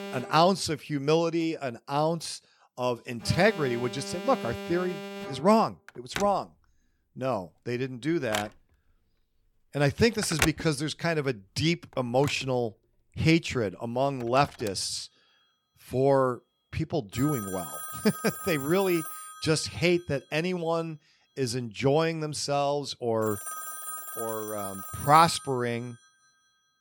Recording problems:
alarms or sirens; loud; throughout; 9 dB below the speech

